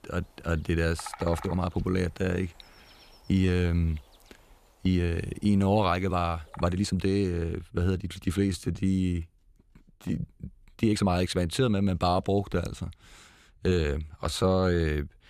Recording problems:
animal sounds; faint; until 7 s; 20 dB below the speech
uneven, jittery; strongly; from 1 to 15 s

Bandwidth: 14.5 kHz